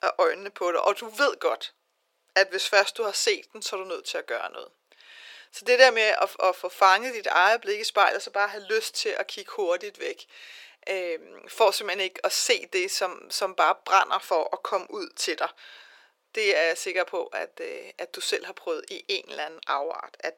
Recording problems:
thin; very; fading below 400 Hz

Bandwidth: 17.5 kHz